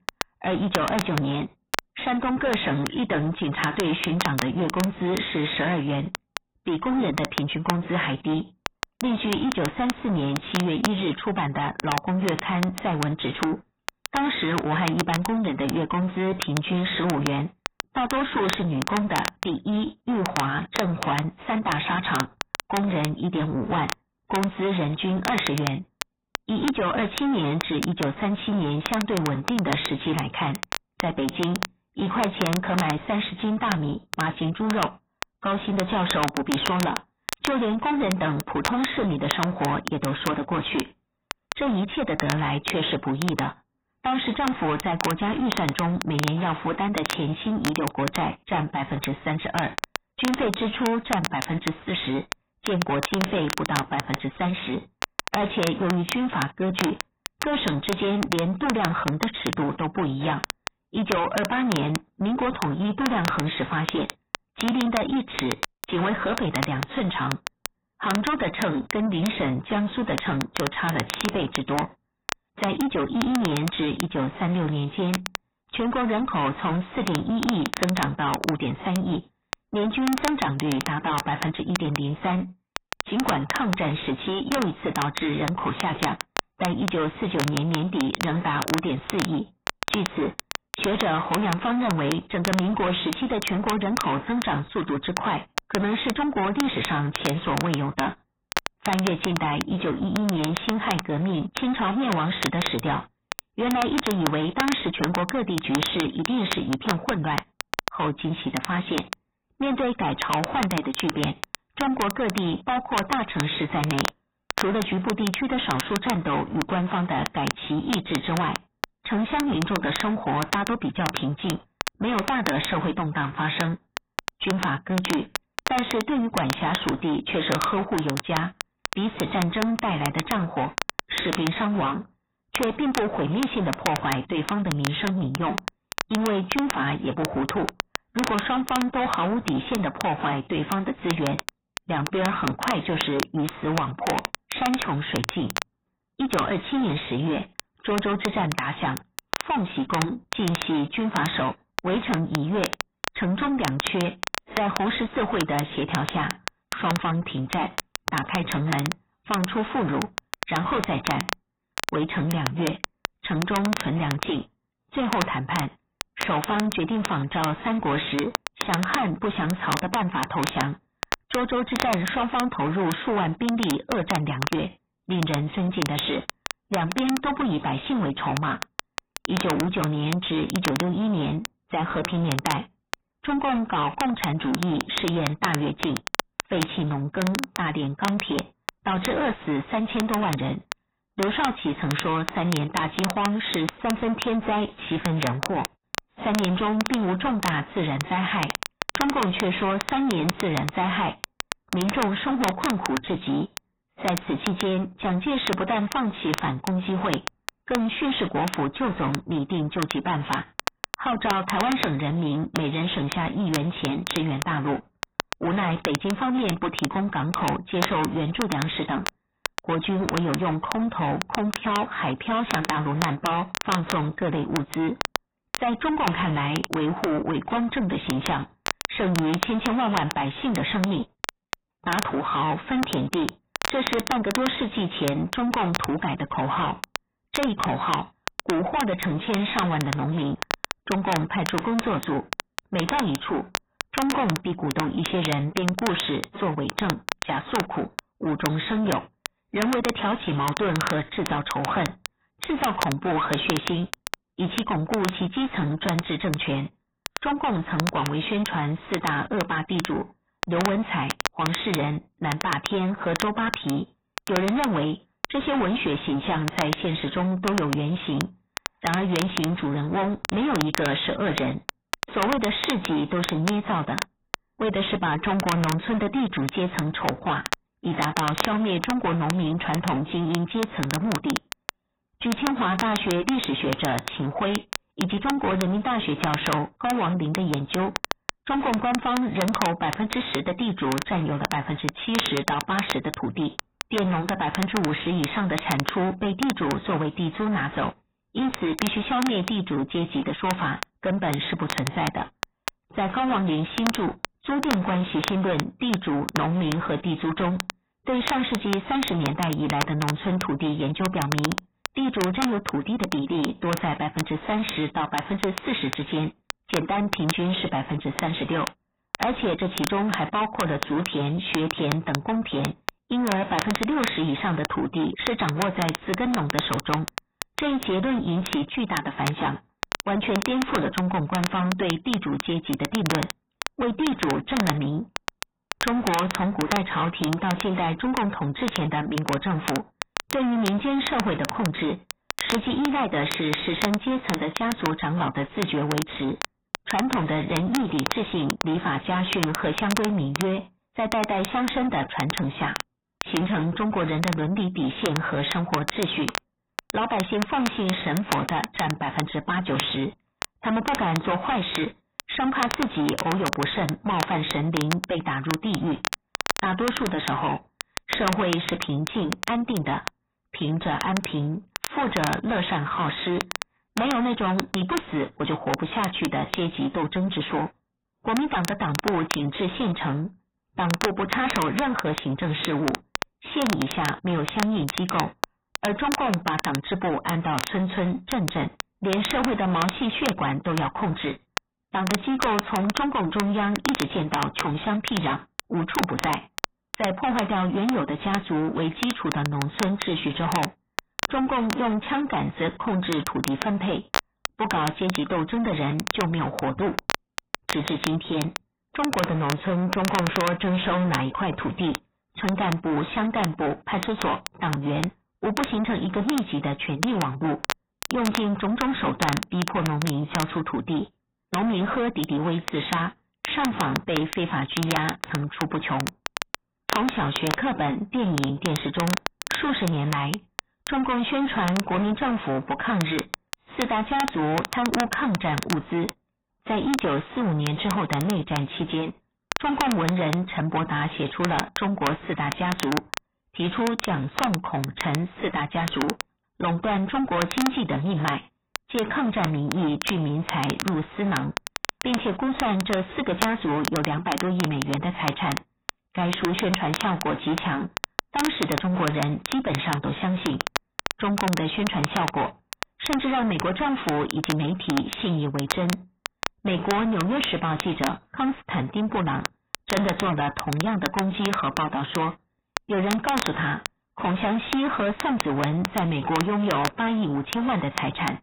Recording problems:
distortion; heavy; 5 dB below the speech
garbled, watery; badly; nothing above 4 kHz
crackle, like an old record; loud; 7 dB below the speech

